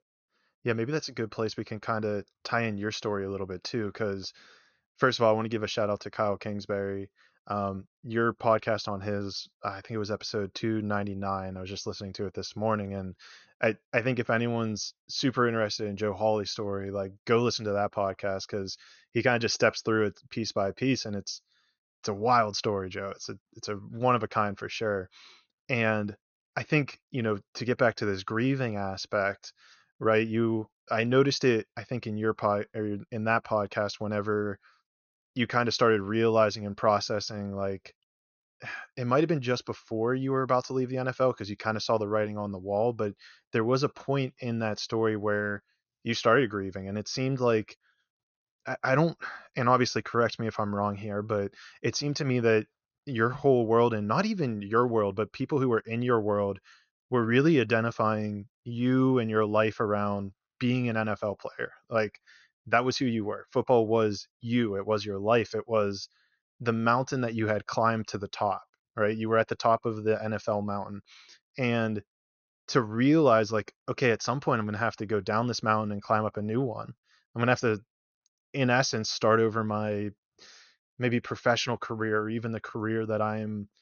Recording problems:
high frequencies cut off; noticeable; nothing above 6.5 kHz

